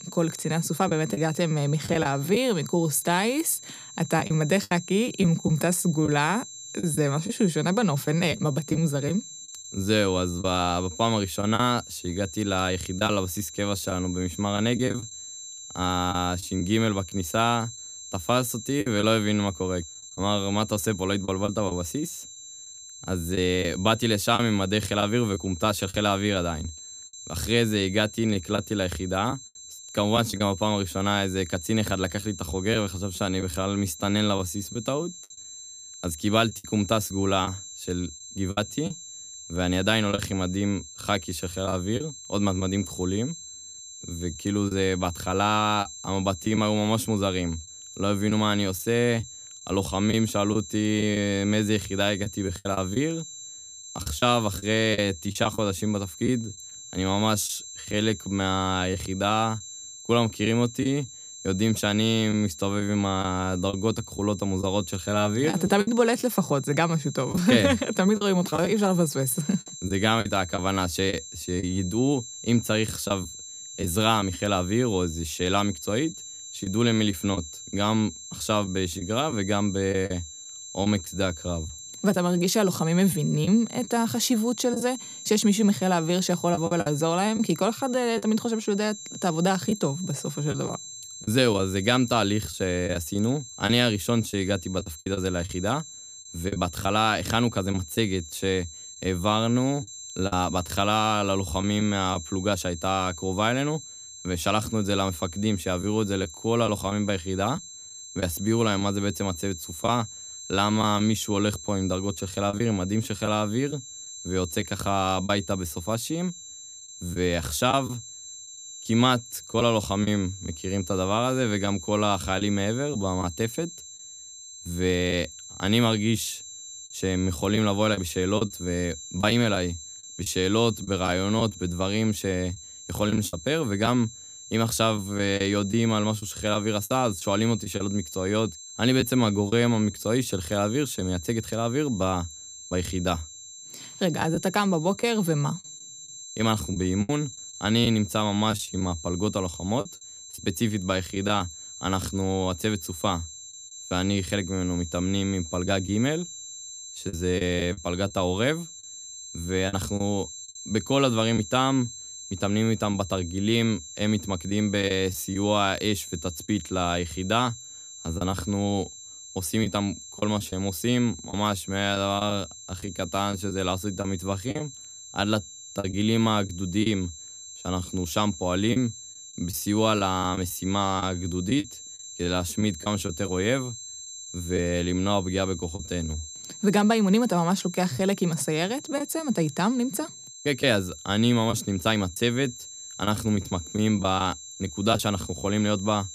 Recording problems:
high-pitched whine; noticeable; throughout; 7.5 kHz, 15 dB below the speech
choppy; occasionally; 4% of the speech affected

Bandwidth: 14.5 kHz